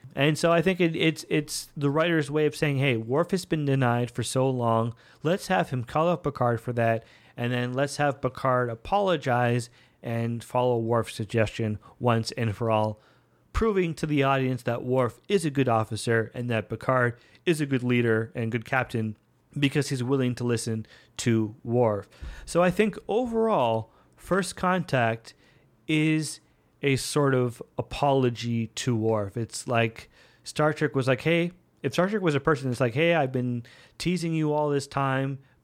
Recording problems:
none

